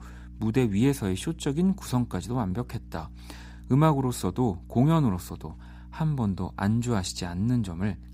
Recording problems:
electrical hum; faint; throughout; 60 Hz, 25 dB below the speech

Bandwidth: 15.5 kHz